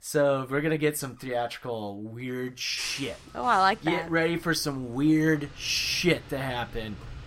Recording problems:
traffic noise; noticeable; from 3 s on; 20 dB below the speech

